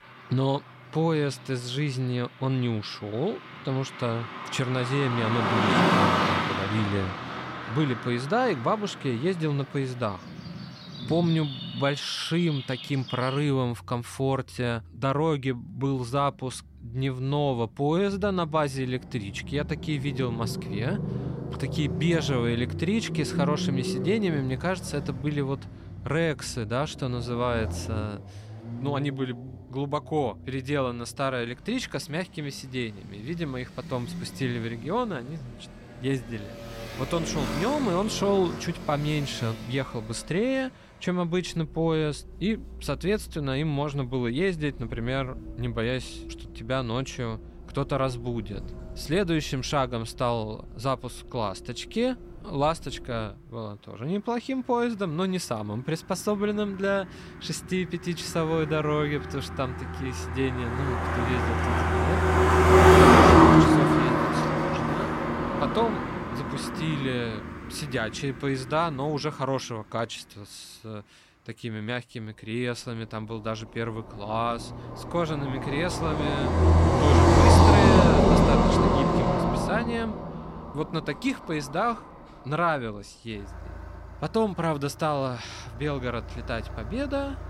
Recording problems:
traffic noise; very loud; throughout; 5 dB above the speech

